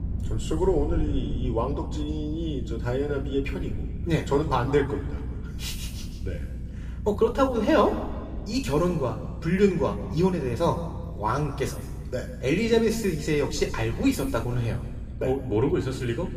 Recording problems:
room echo; noticeable; dies away in 1.3 s
off-mic speech; somewhat distant
low rumble; faint; throughout; 20 dB below the speech

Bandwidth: 15 kHz